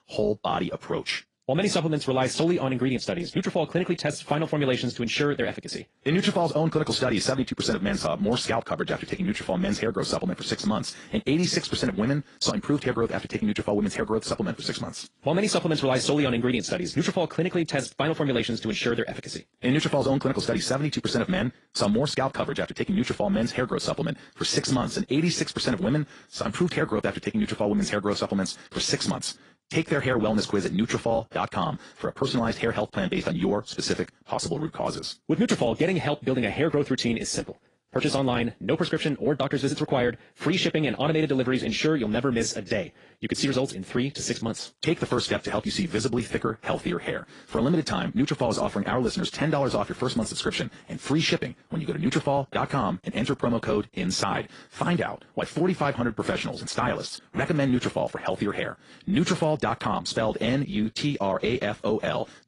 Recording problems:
wrong speed, natural pitch; too fast; 1.5 times normal speed
garbled, watery; slightly

